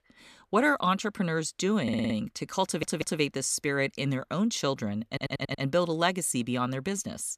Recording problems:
audio stuttering; at 2 s, at 2.5 s and at 5 s

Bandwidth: 14.5 kHz